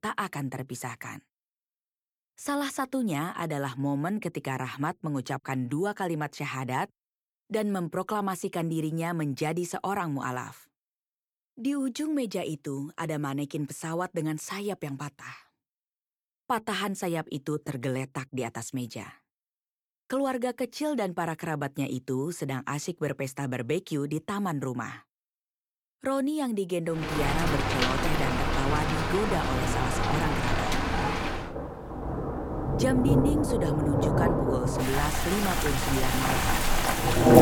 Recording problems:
rain or running water; very loud; from 27 s on; 4 dB above the speech

